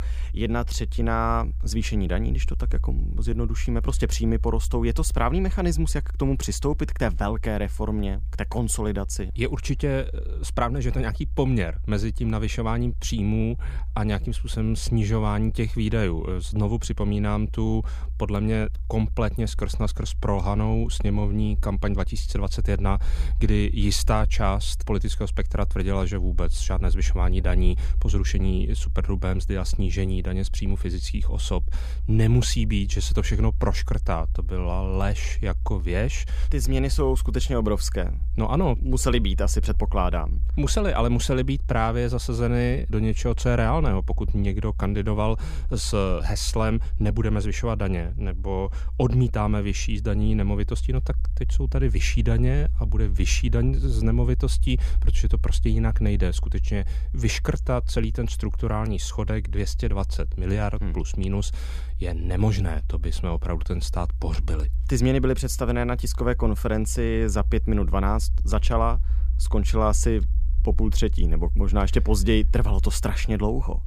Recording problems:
low rumble; faint; throughout; 20 dB below the speech

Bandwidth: 15 kHz